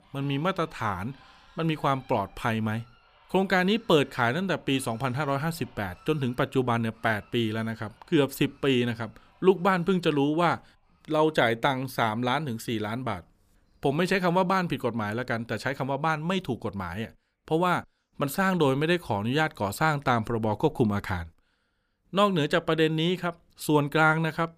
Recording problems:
animal sounds; faint; throughout; 30 dB below the speech

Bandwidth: 15 kHz